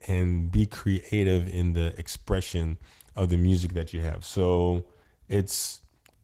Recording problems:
garbled, watery; slightly; nothing above 16 kHz

